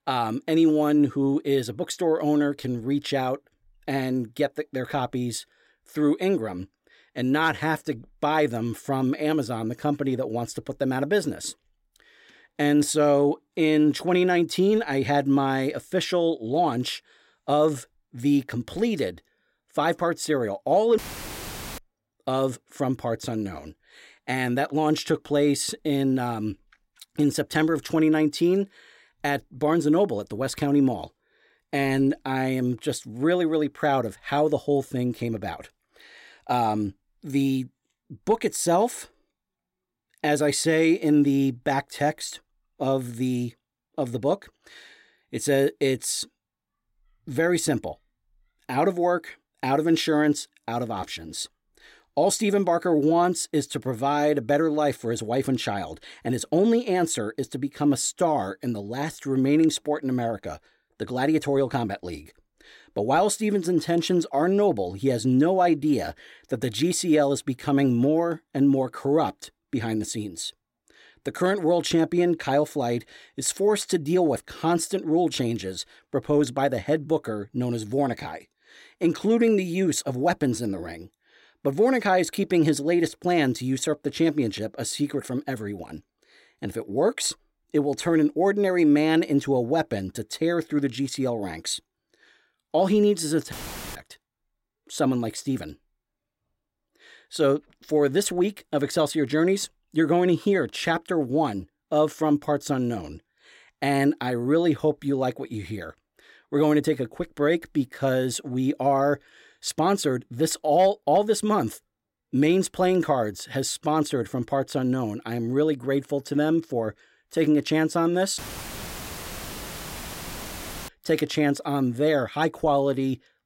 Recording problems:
audio cutting out; filled with static; at 21 s for 1 s, at 1:34 and at 1:58 for 2.5 s

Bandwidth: 16 kHz